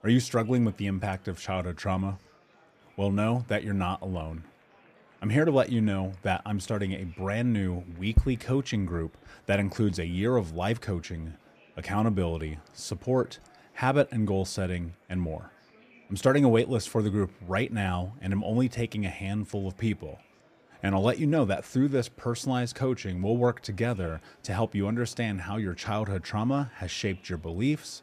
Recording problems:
murmuring crowd; faint; throughout; 30 dB below the speech

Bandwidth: 14.5 kHz